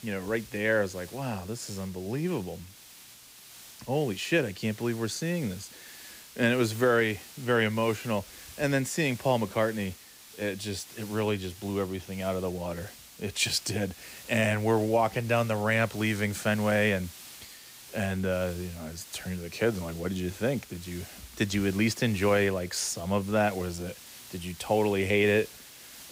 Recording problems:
hiss; noticeable; throughout; 15 dB below the speech

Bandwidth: 15.5 kHz